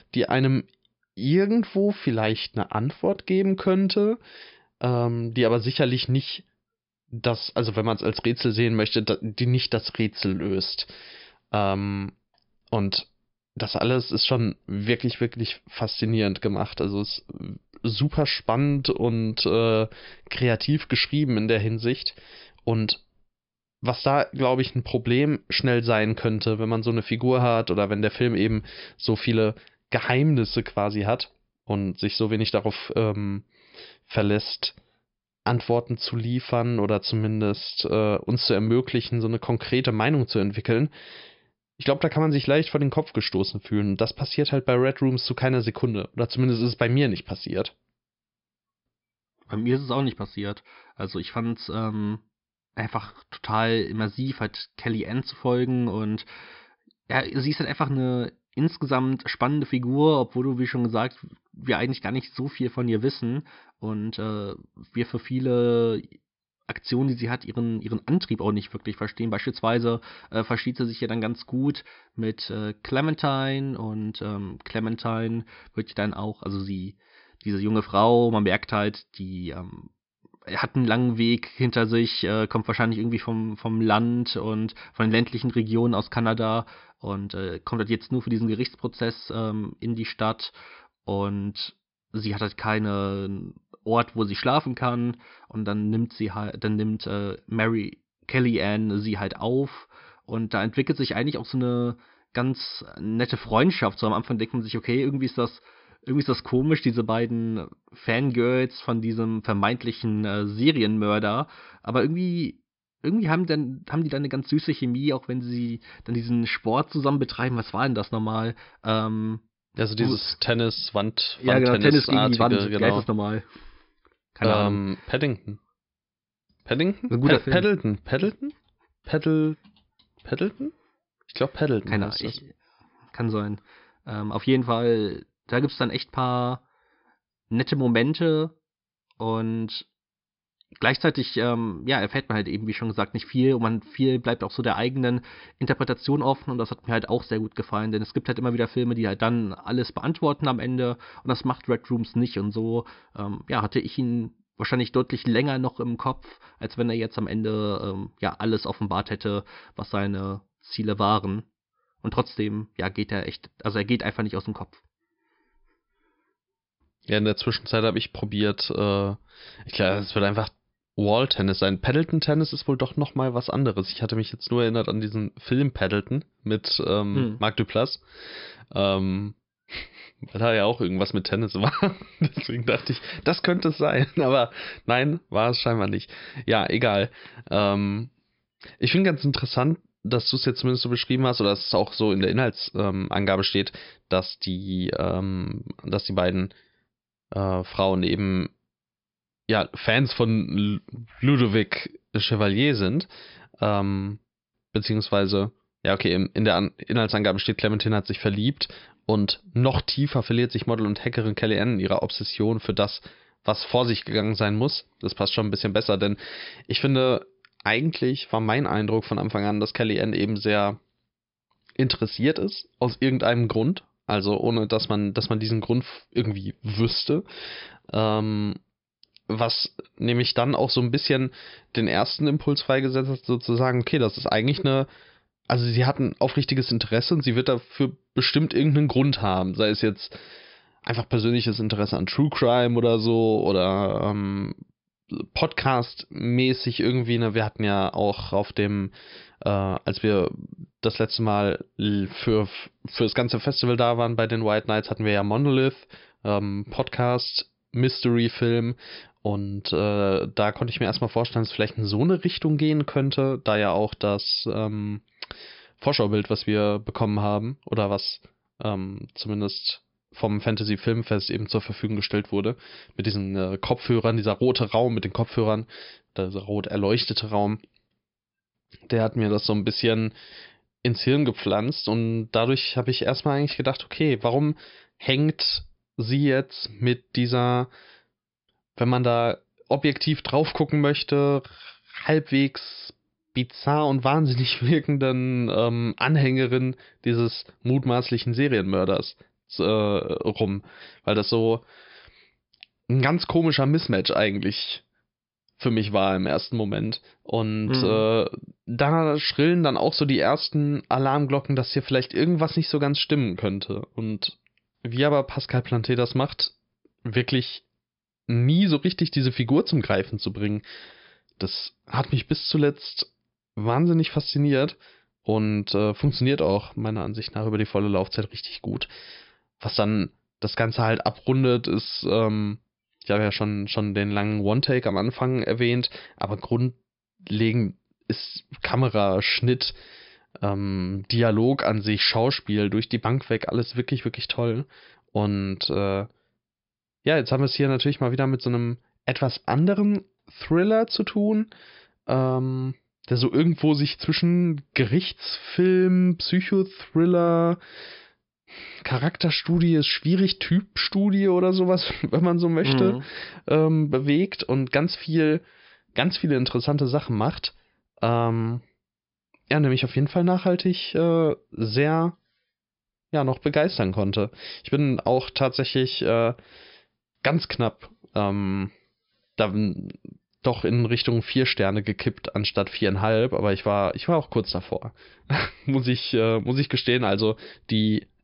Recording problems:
high frequencies cut off; noticeable; nothing above 5.5 kHz

